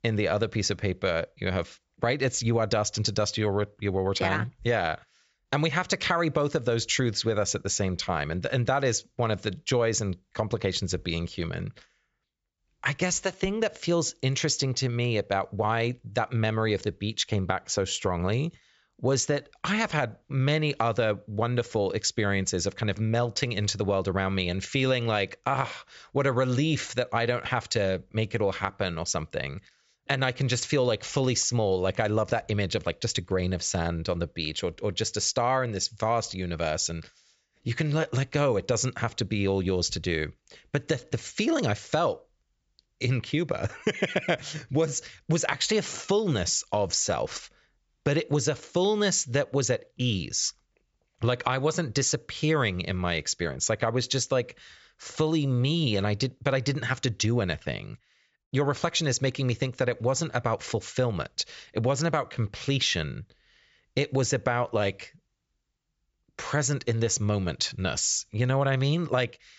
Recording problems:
high frequencies cut off; noticeable; nothing above 8 kHz

